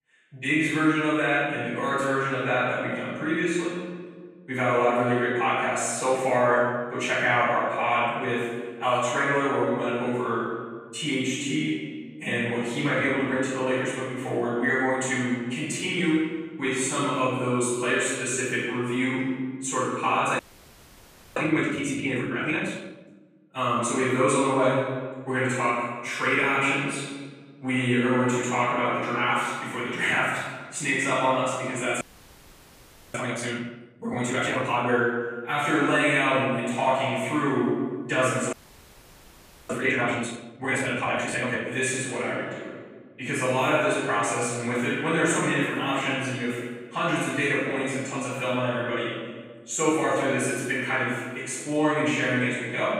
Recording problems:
room echo; strong; dies away in 1.4 s
off-mic speech; far
audio freezing; at 20 s for 1 s, at 32 s for 1 s and at 39 s for 1 s

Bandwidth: 15 kHz